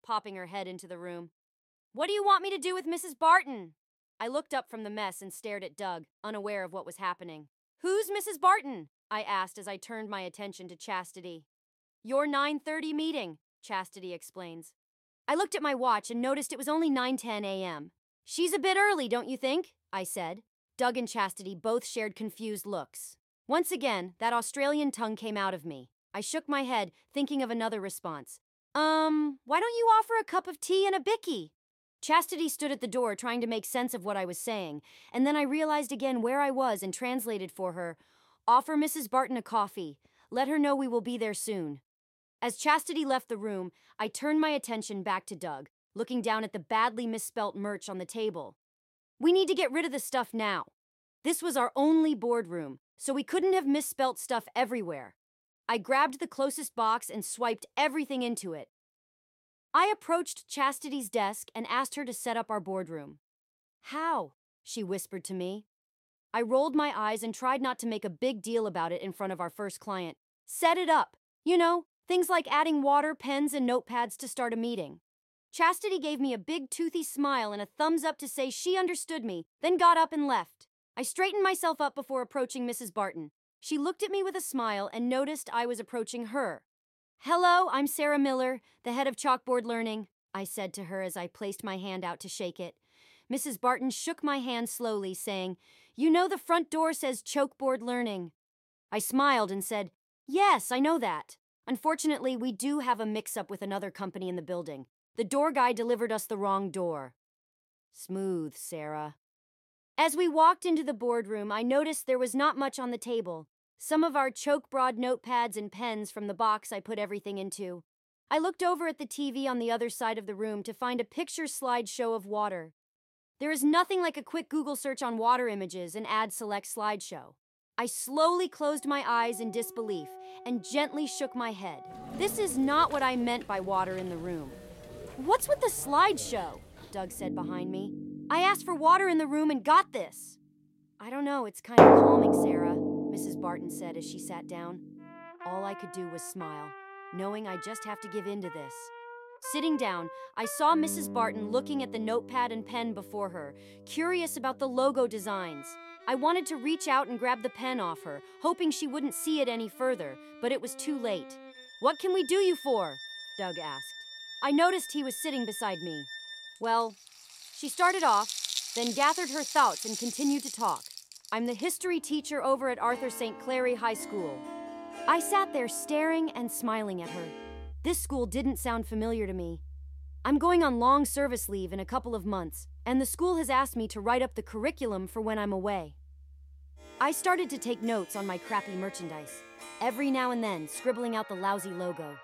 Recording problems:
background music; loud; from 2:09 on; 2 dB below the speech

